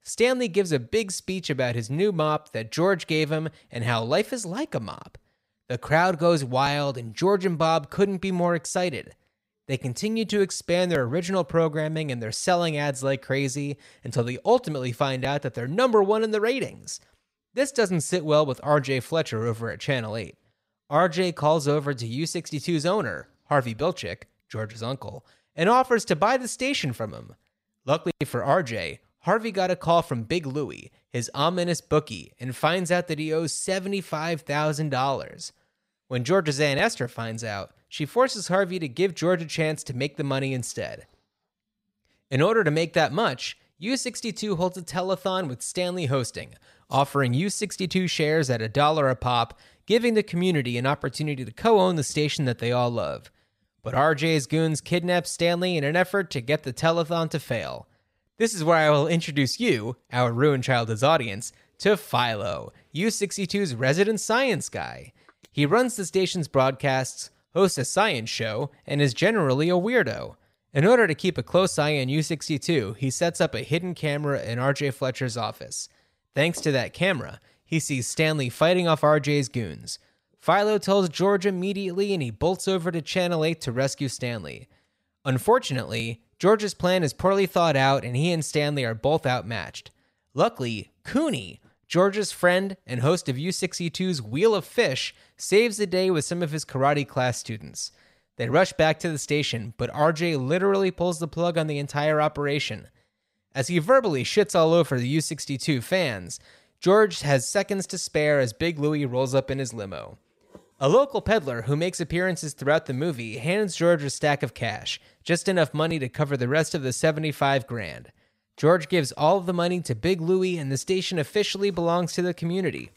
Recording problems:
none

